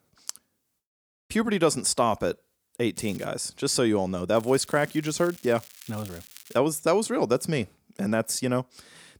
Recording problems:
crackling; faint; at 3 s and from 4.5 to 6.5 s; 20 dB below the speech

